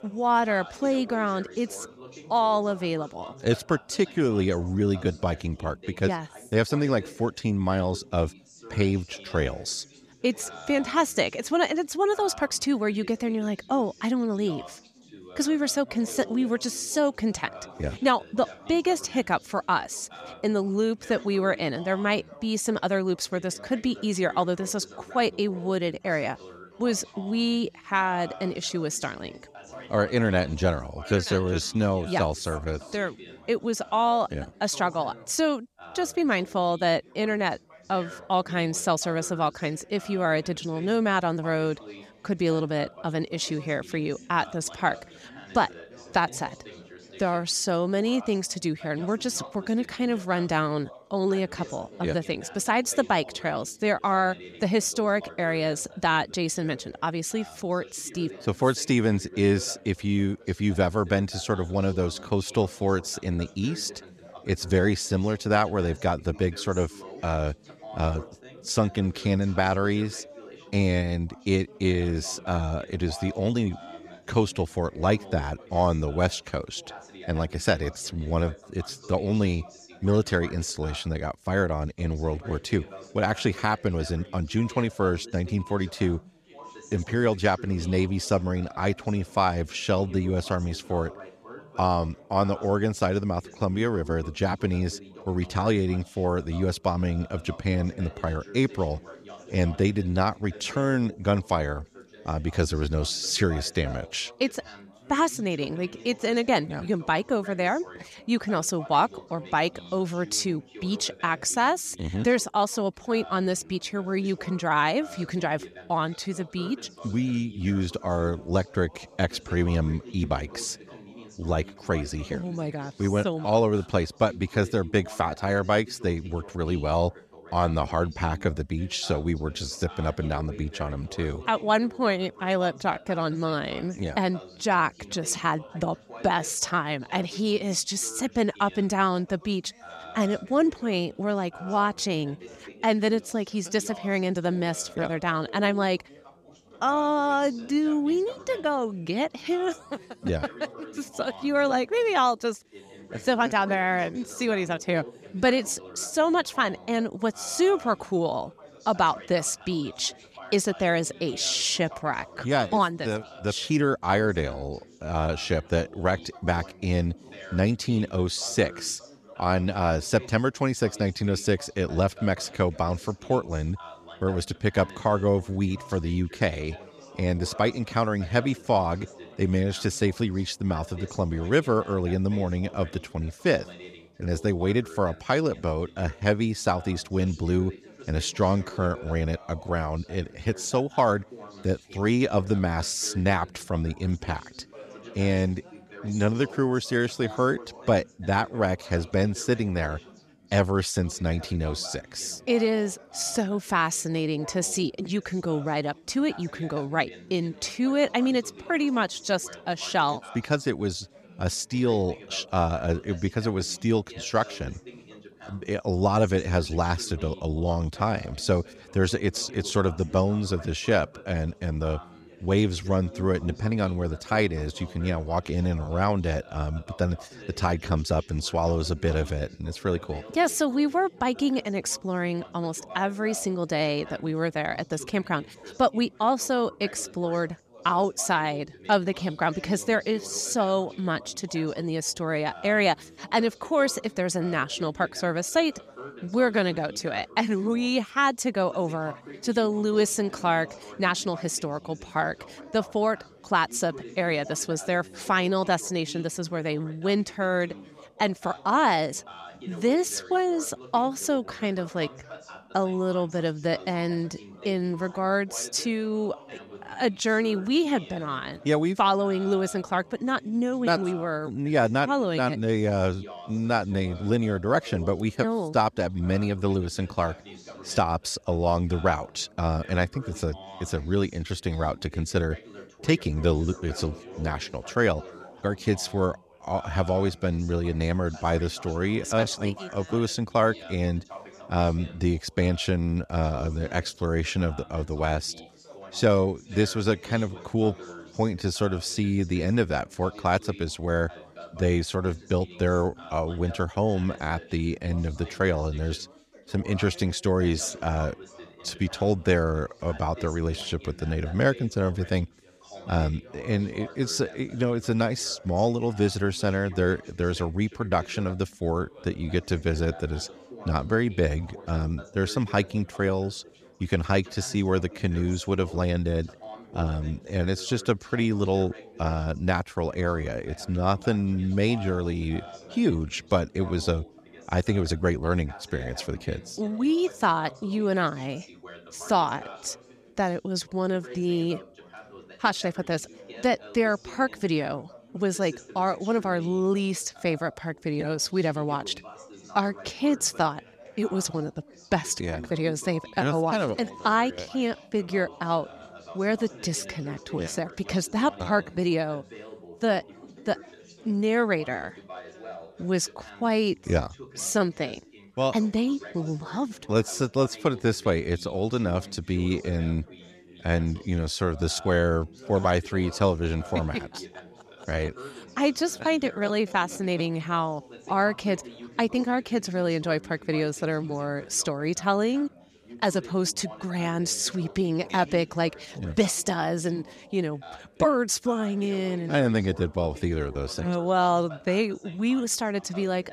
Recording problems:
background chatter; noticeable; throughout; 3 voices, 20 dB below the speech

